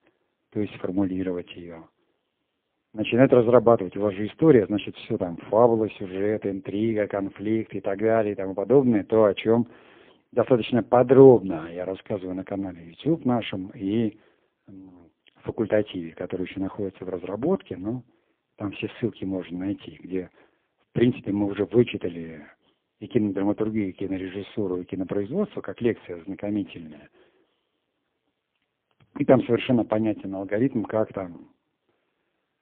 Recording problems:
phone-call audio; poor line

